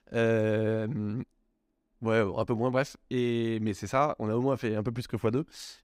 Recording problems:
none

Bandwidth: 15.5 kHz